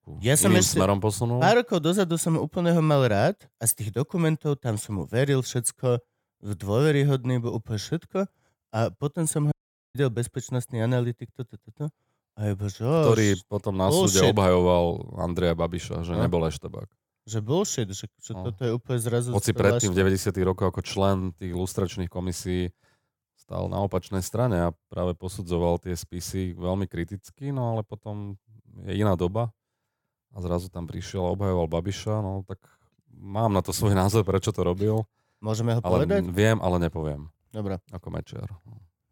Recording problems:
audio cutting out; at 9.5 s

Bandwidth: 17 kHz